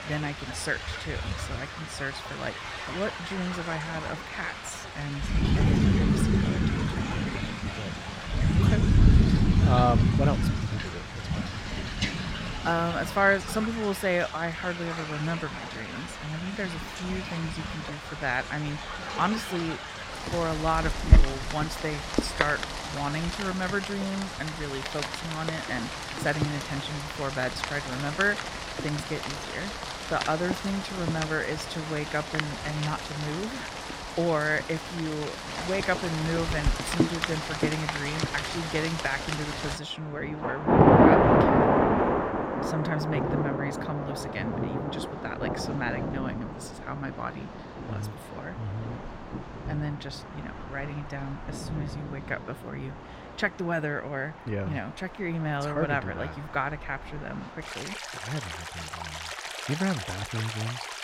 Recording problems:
rain or running water; very loud; throughout; 3 dB above the speech

